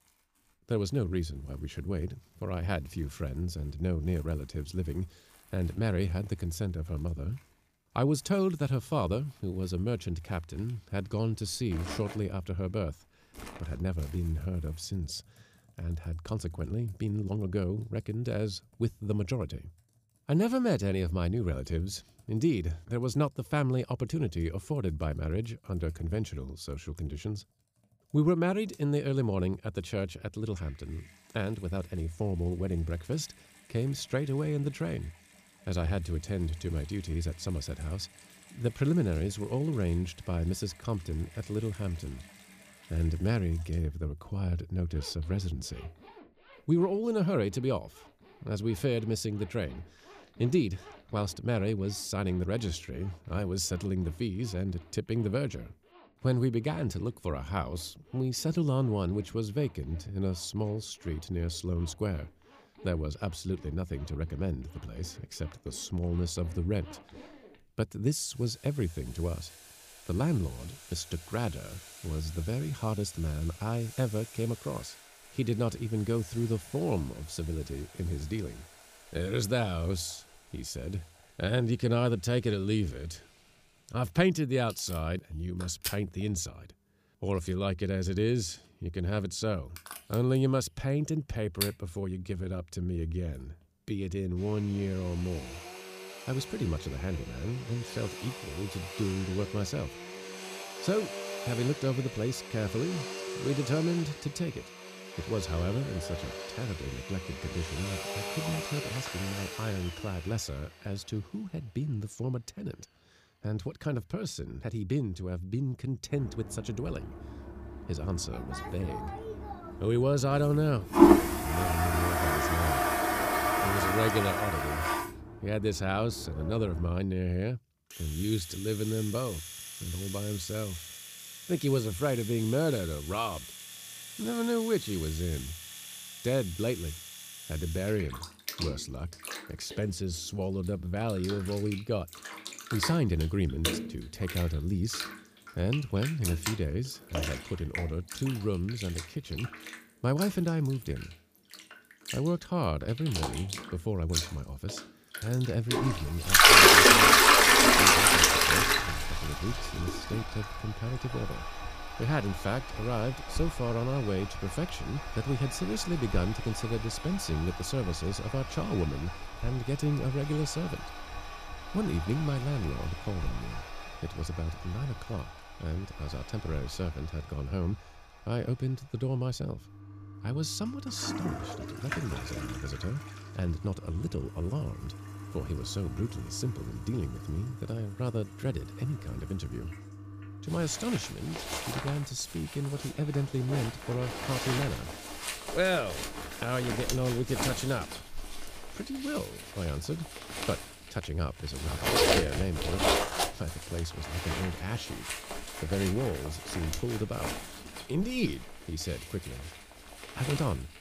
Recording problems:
household noises; very loud; throughout; 3 dB above the speech

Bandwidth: 15 kHz